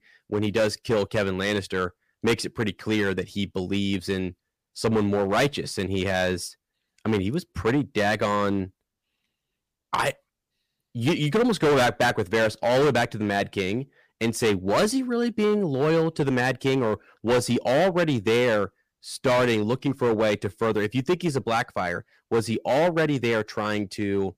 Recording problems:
distortion; heavy; 8% of the sound clipped

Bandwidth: 15 kHz